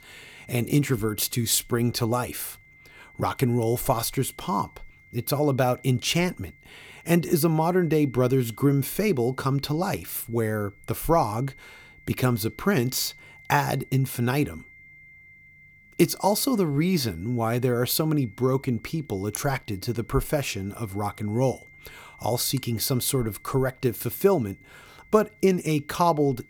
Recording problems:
high-pitched whine; faint; throughout; 2 kHz, 25 dB below the speech

